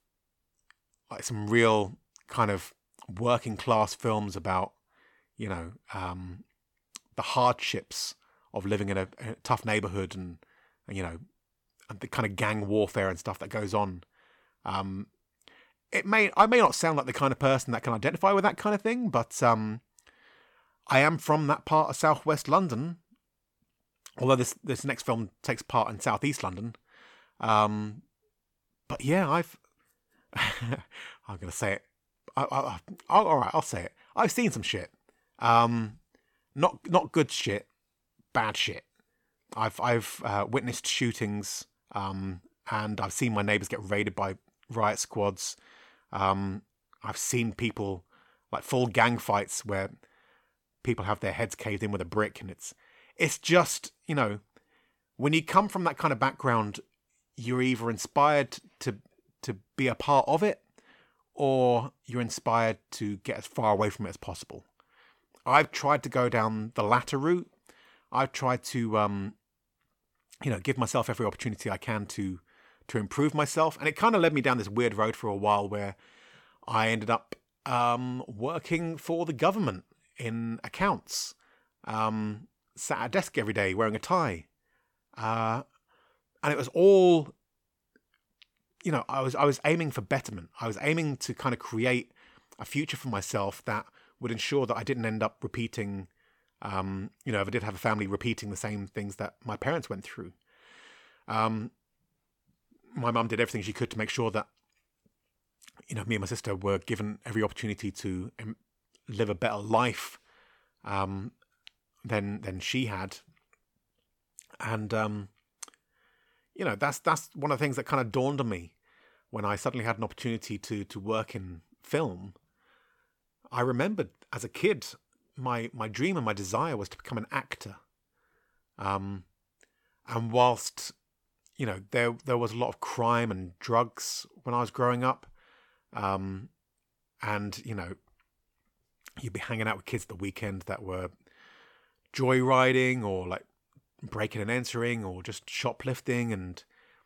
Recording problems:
none

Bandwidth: 17 kHz